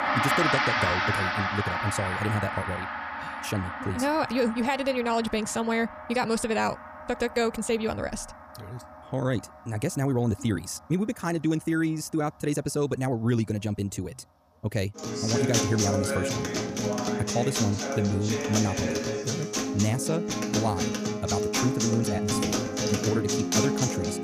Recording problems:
wrong speed, natural pitch; too fast; 1.6 times normal speed
background music; very loud; throughout; 1 dB above the speech

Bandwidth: 14.5 kHz